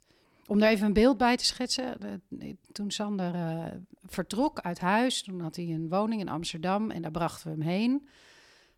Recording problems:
none

